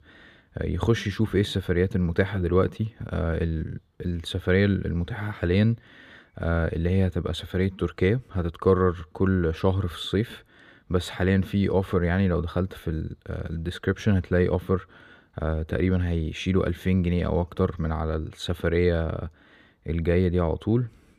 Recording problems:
none

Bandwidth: 15 kHz